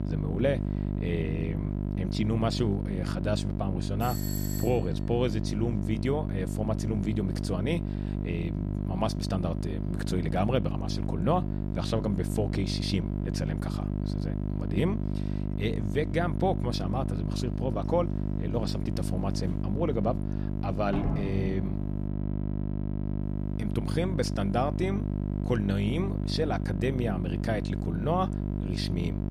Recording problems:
electrical hum; loud; throughout; 50 Hz, 7 dB below the speech
doorbell; noticeable; at 4 s; peak 5 dB below the speech
door banging; noticeable; from 19 to 22 s; peak level with the speech

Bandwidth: 14.5 kHz